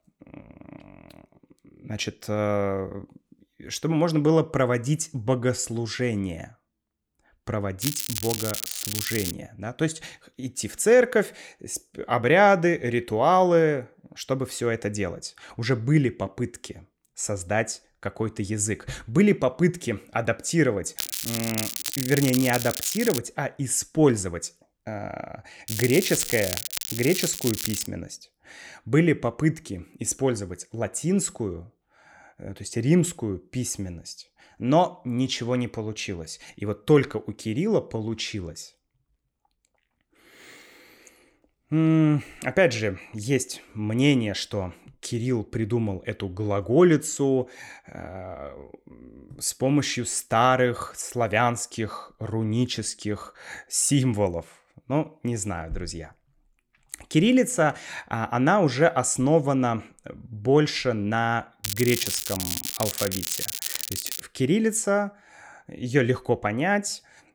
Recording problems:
crackling; loud; 4 times, first at 8 s; 5 dB below the speech

